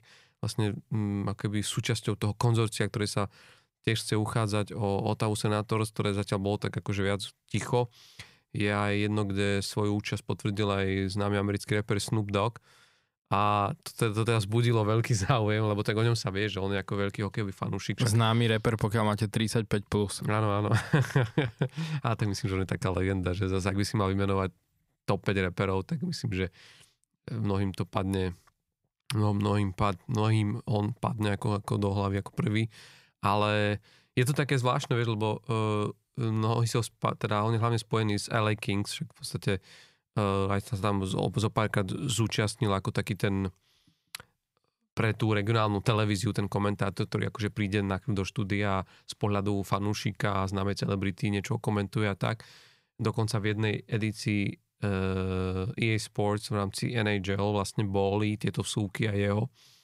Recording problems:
none

